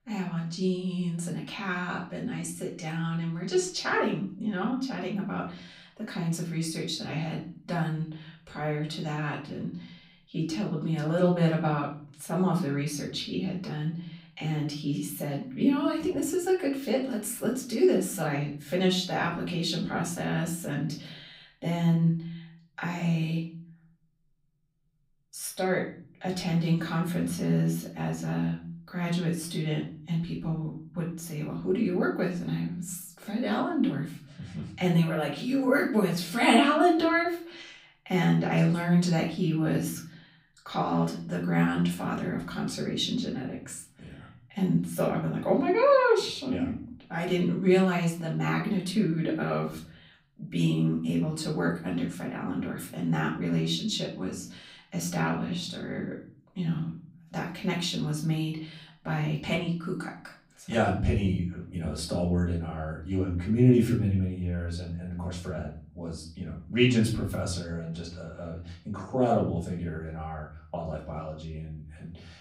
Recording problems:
off-mic speech; far
room echo; slight; dies away in 0.5 s

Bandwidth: 15.5 kHz